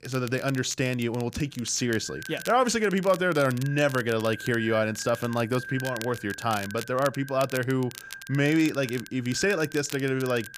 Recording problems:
echo of what is said; noticeable; throughout; 580 ms later, 15 dB below the speech
crackle, like an old record; noticeable; 15 dB below the speech

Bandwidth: 15 kHz